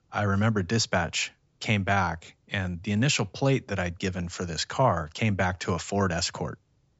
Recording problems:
high frequencies cut off; noticeable; nothing above 8 kHz

